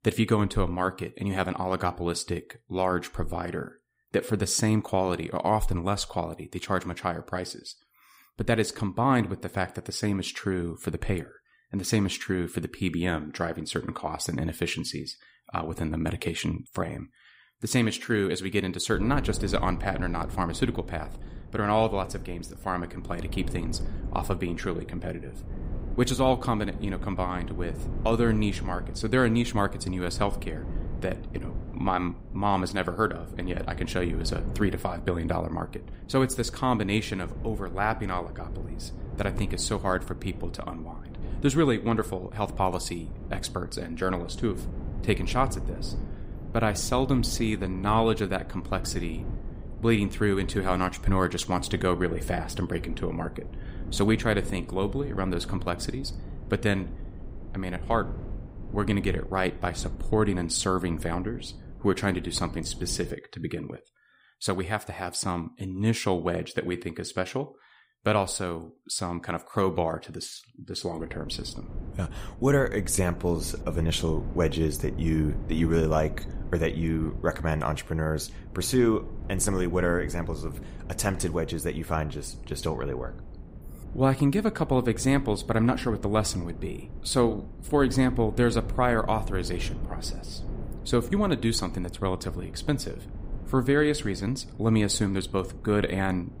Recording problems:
wind noise on the microphone; occasional gusts; from 19 s to 1:03 and from 1:11 on; 20 dB below the speech

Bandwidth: 15.5 kHz